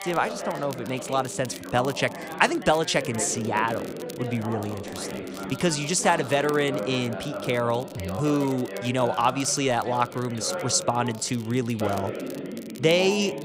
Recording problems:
background chatter; loud; throughout; 3 voices, 9 dB below the speech
crackle, like an old record; faint; 20 dB below the speech

